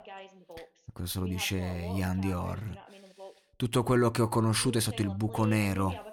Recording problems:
voice in the background; noticeable; throughout; 15 dB below the speech

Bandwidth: 18 kHz